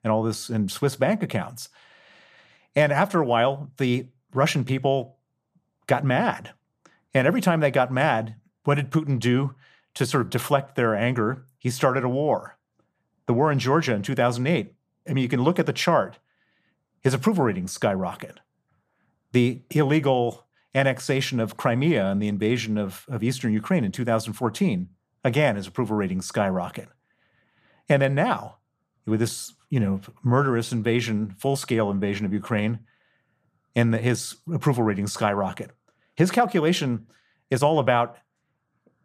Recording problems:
none

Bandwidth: 14.5 kHz